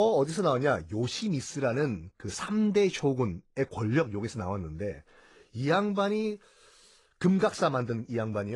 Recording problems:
garbled, watery; slightly; nothing above 10 kHz
abrupt cut into speech; at the start and the end

